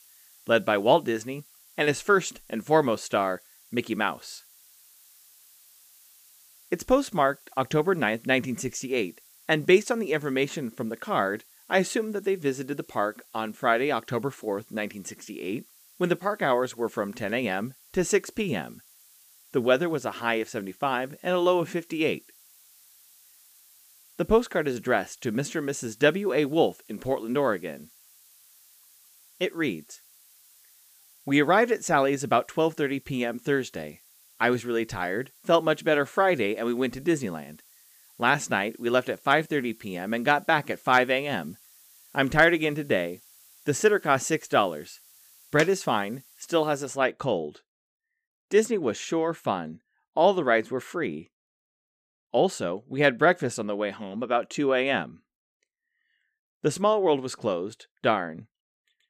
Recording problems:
hiss; faint; until 47 s; 25 dB below the speech

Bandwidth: 15 kHz